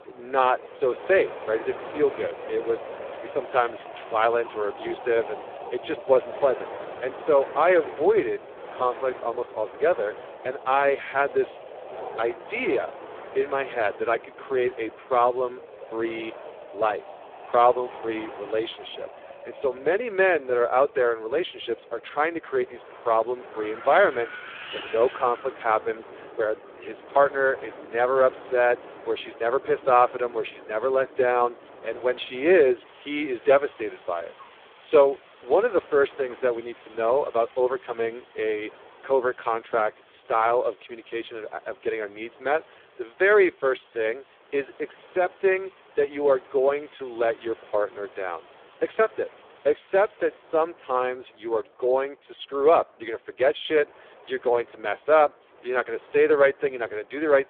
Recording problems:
phone-call audio; poor line
wind in the background; noticeable; throughout; 15 dB below the speech

